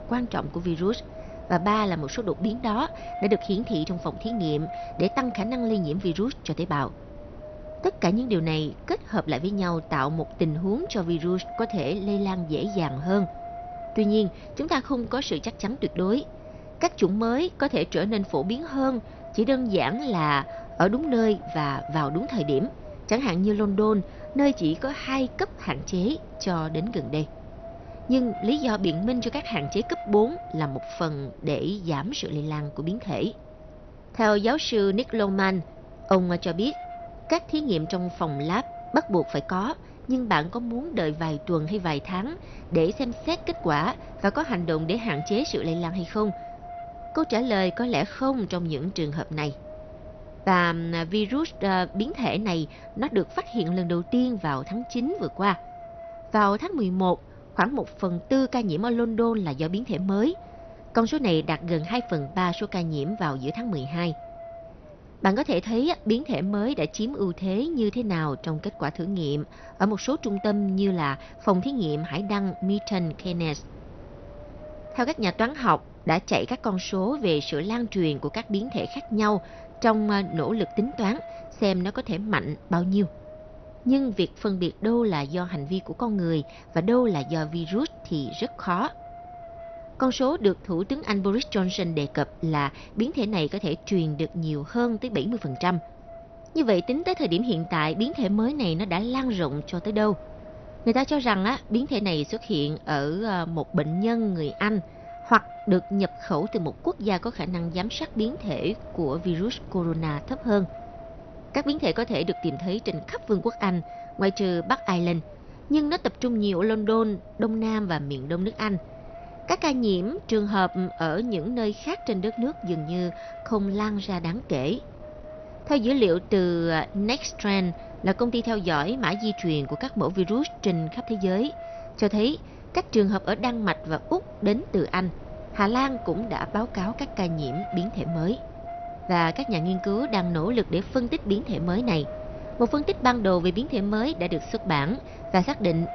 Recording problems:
garbled, watery; slightly; nothing above 6 kHz
wind noise on the microphone; occasional gusts; 15 dB below the speech

